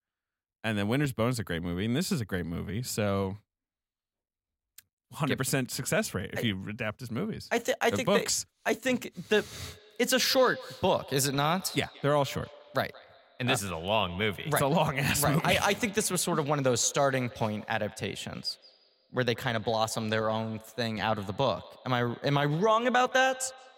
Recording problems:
echo of what is said; faint; from 9.5 s on; 170 ms later, 20 dB below the speech

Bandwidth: 16 kHz